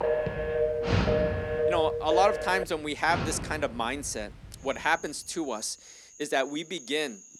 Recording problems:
animal sounds; loud; throughout; 6 dB below the speech
phone ringing; loud; until 2.5 s; peak 2 dB above the speech

